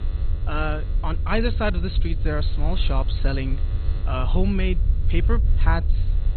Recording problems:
garbled, watery; badly; nothing above 4 kHz
electrical hum; noticeable; throughout; 60 Hz, 20 dB below the speech
low rumble; noticeable; throughout; 15 dB below the speech

